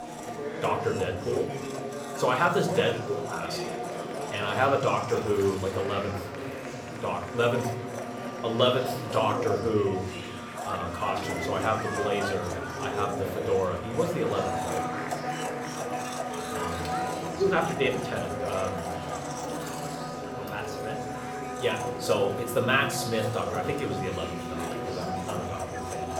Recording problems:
room echo; slight; dies away in 0.6 s
off-mic speech; somewhat distant
household noises; loud; throughout; 7 dB below the speech
murmuring crowd; loud; throughout; 8 dB below the speech
background music; faint; throughout; 25 dB below the speech

